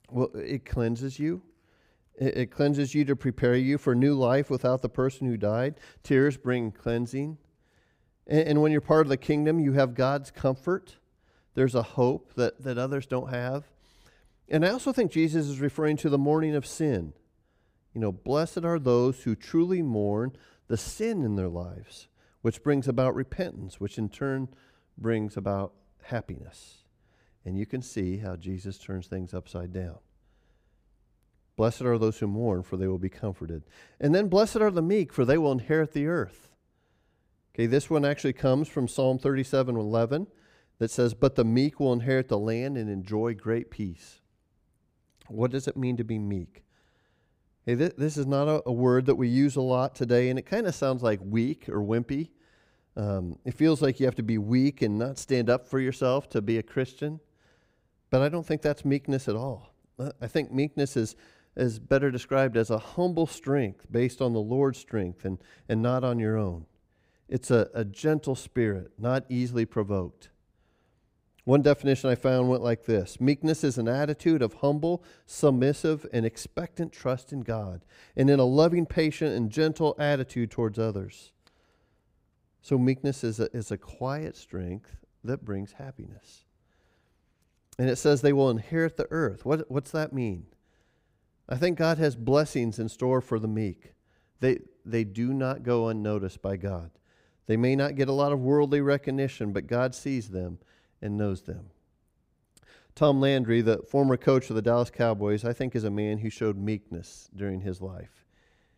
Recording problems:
none

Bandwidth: 15.5 kHz